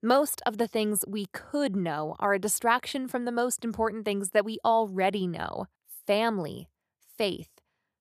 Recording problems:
none

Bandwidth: 14.5 kHz